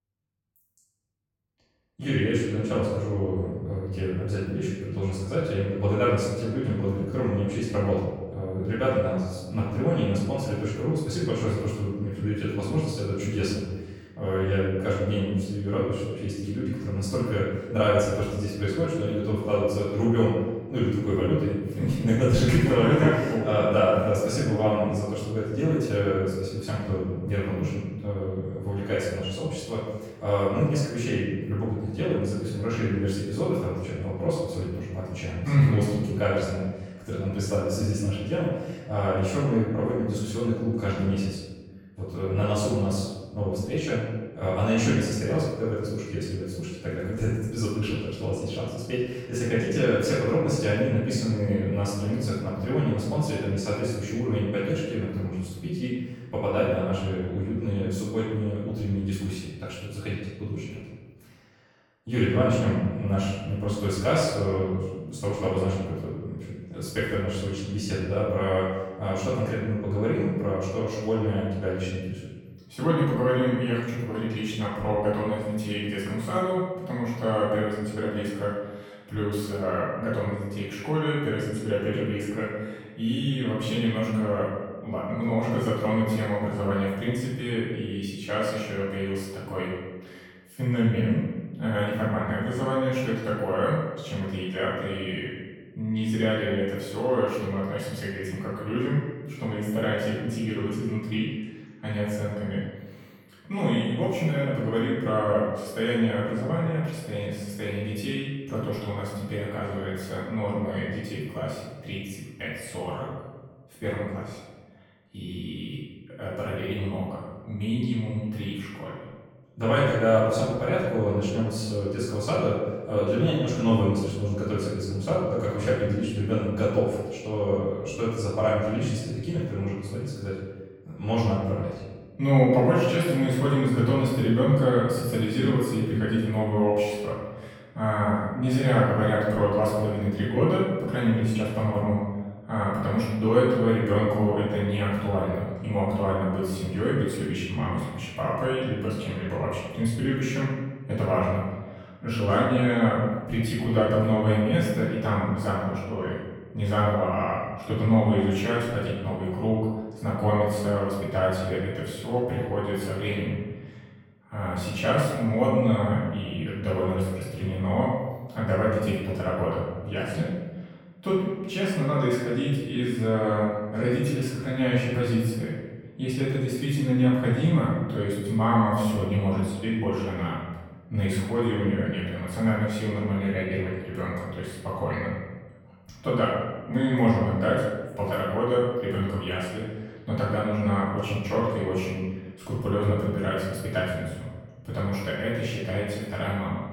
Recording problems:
off-mic speech; far
room echo; noticeable; dies away in 1.1 s

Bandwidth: 17.5 kHz